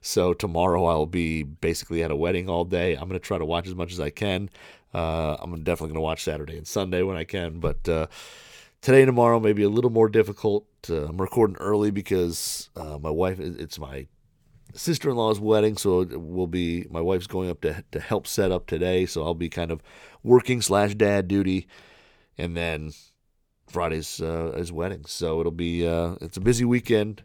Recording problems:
none

